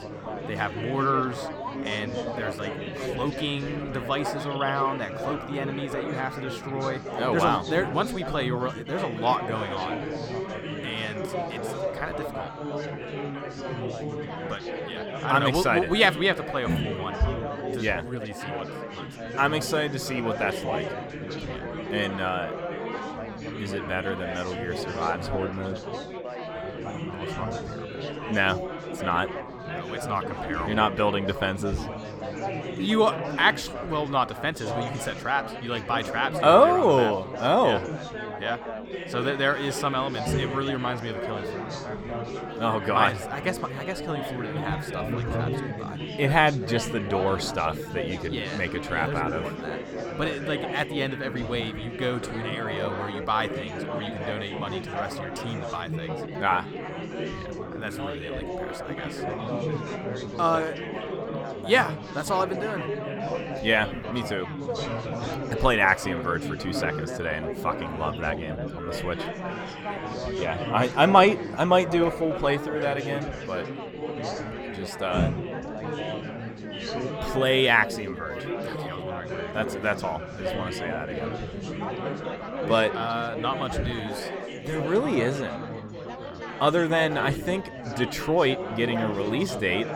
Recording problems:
chatter from many people; loud; throughout; 6 dB below the speech

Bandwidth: 18.5 kHz